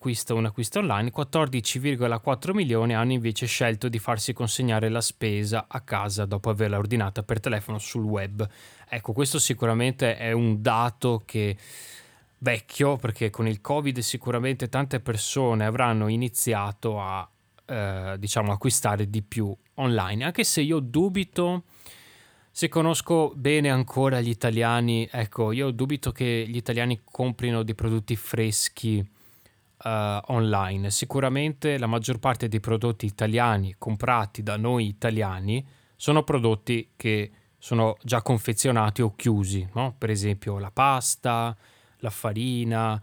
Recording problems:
none

